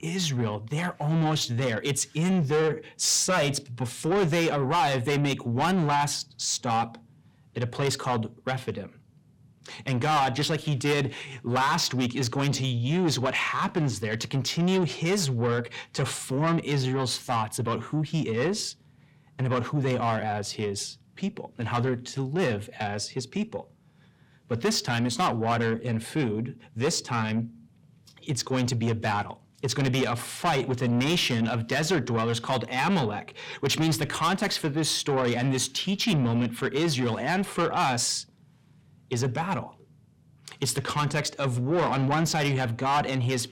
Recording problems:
distortion; heavy; 8 dB below the speech

